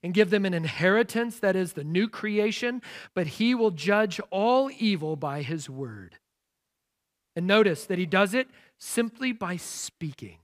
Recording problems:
none

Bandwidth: 15 kHz